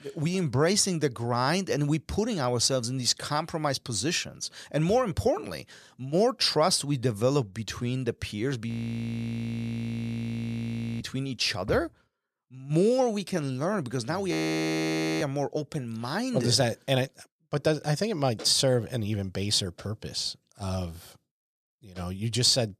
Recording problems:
audio freezing; at 8.5 s for 2.5 s and at 14 s for 1 s

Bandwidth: 14.5 kHz